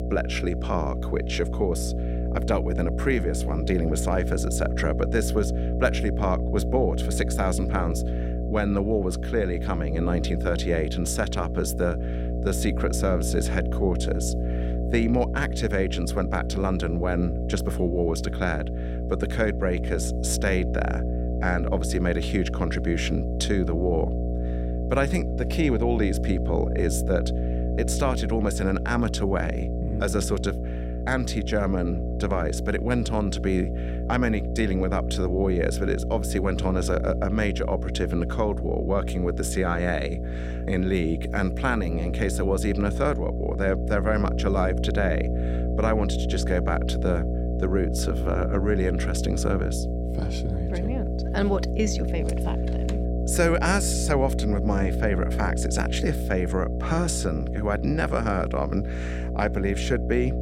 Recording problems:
electrical hum; loud; throughout; 60 Hz, 7 dB below the speech

